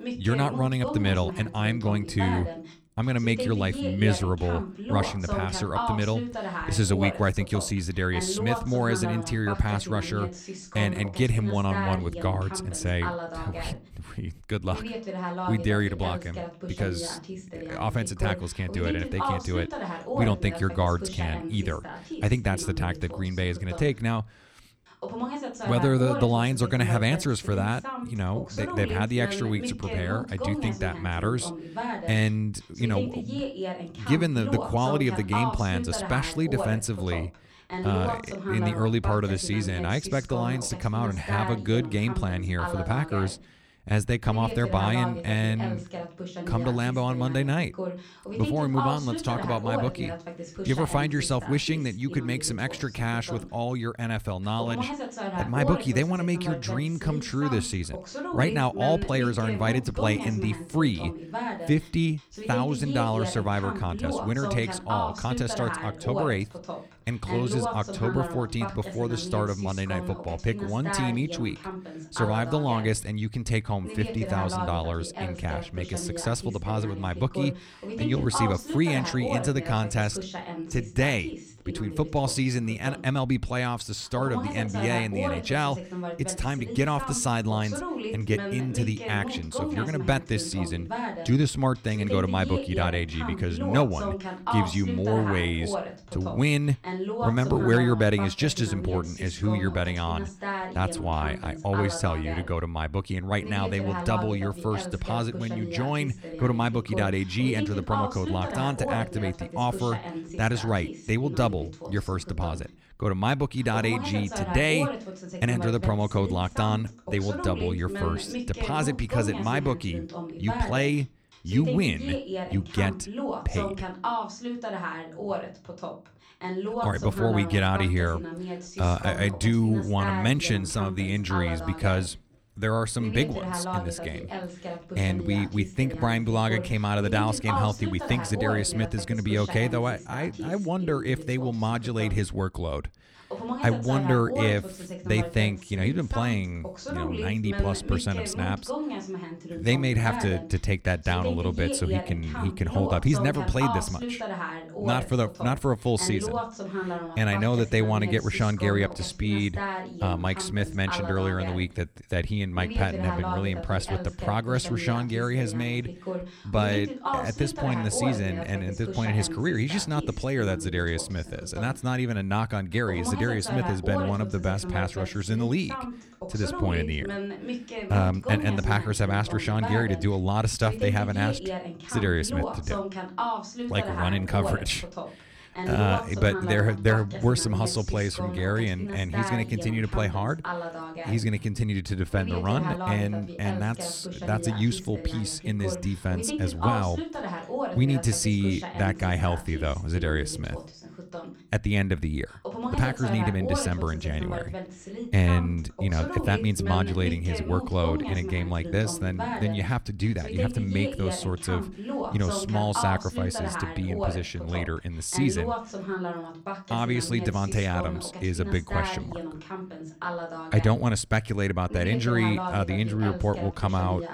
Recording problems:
voice in the background; loud; throughout; 7 dB below the speech

